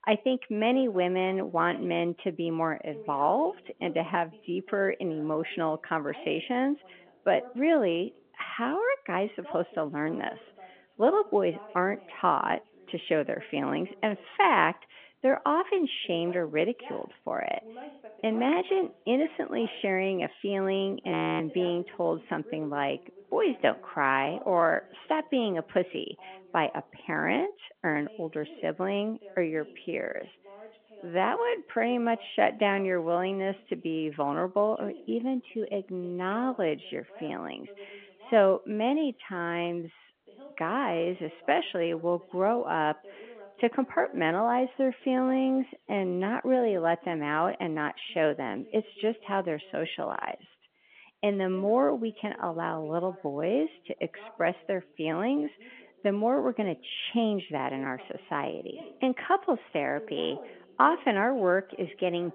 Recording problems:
phone-call audio; nothing above 3.5 kHz
voice in the background; faint; throughout; 20 dB below the speech
audio freezing; at 21 s

